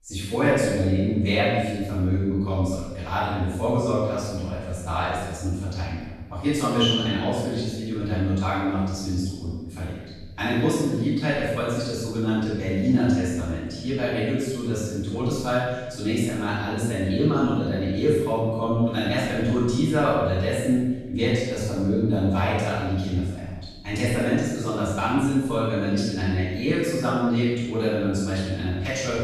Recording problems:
room echo; strong; dies away in 1.1 s
off-mic speech; far

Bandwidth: 13.5 kHz